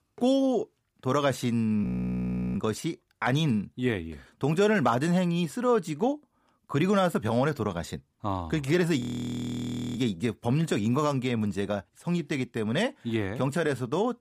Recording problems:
audio freezing; at 2 s for 0.5 s and at 9 s for 1 s

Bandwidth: 15 kHz